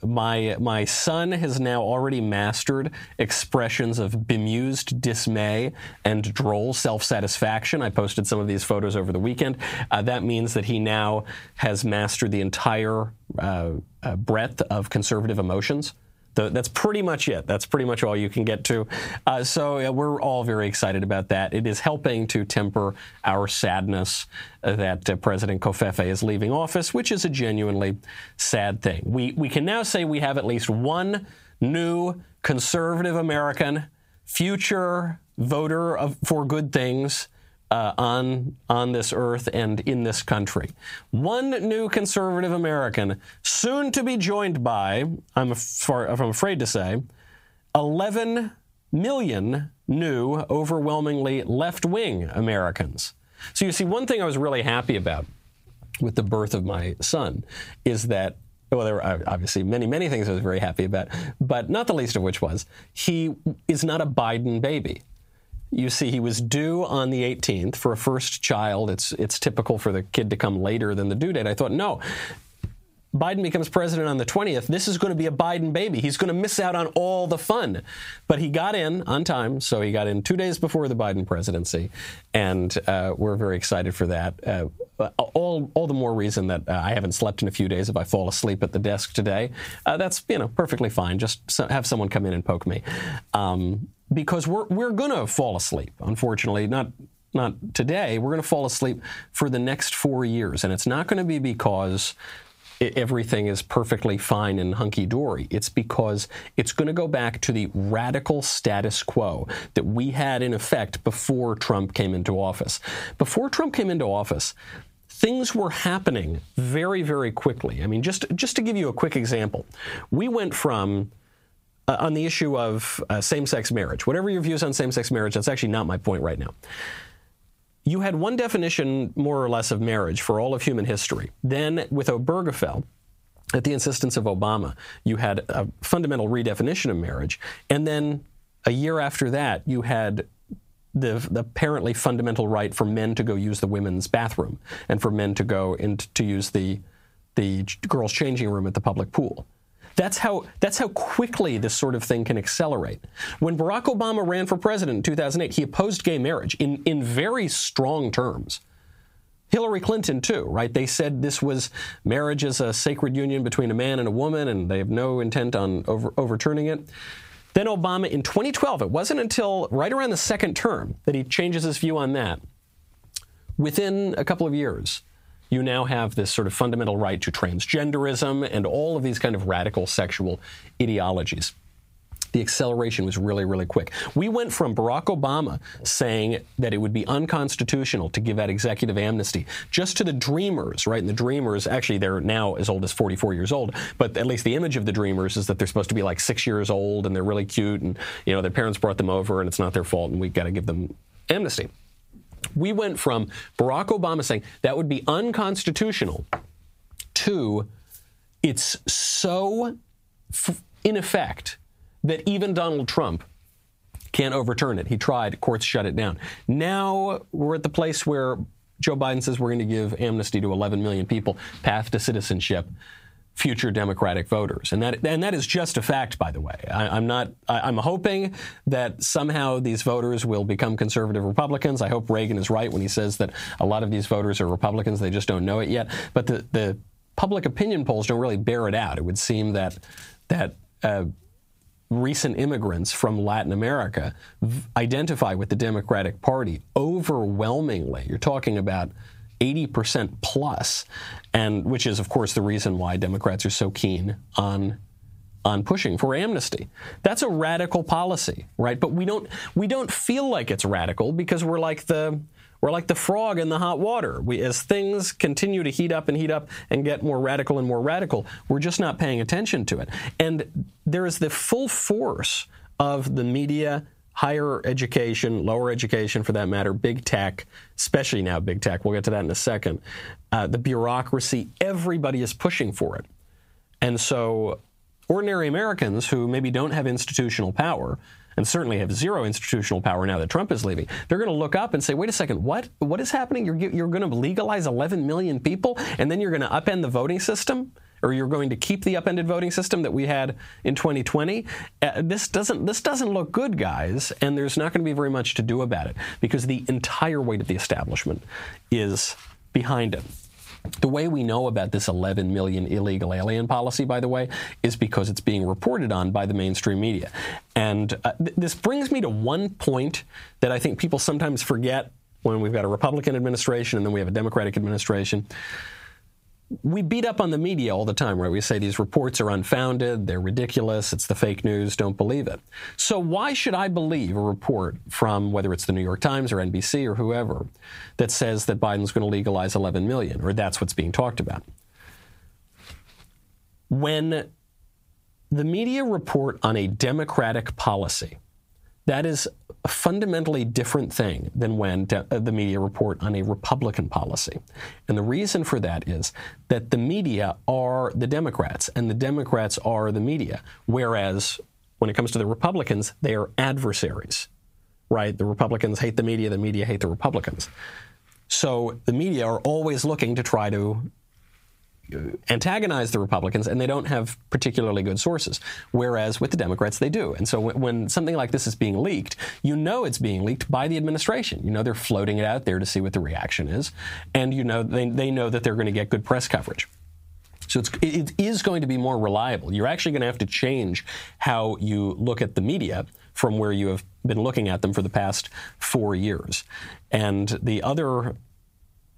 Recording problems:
squashed, flat; heavily

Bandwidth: 15.5 kHz